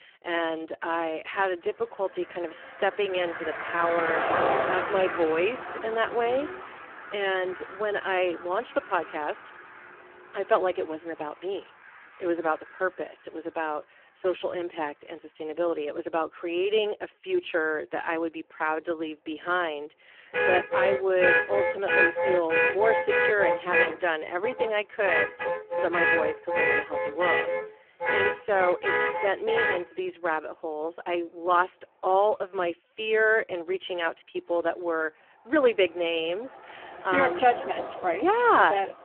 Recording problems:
phone-call audio; poor line
traffic noise; very loud; throughout; 1 dB above the speech

